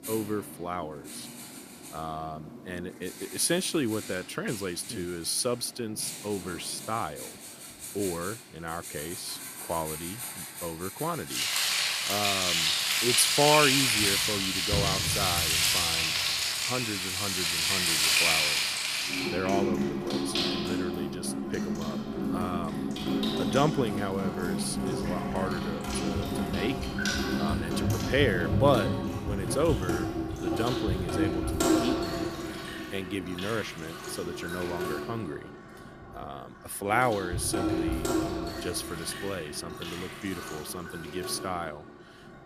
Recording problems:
household noises; very loud; throughout; 4 dB above the speech

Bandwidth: 14.5 kHz